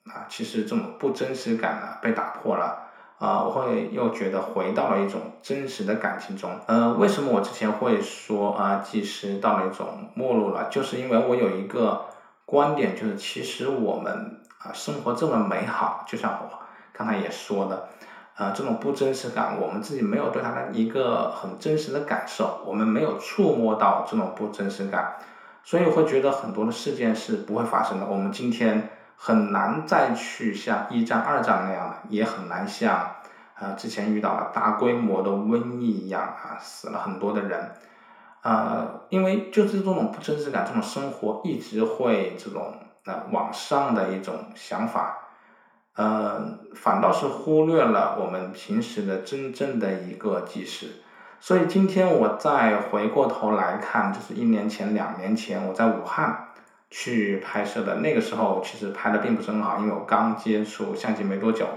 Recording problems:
room echo; slight; dies away in 0.6 s
off-mic speech; somewhat distant

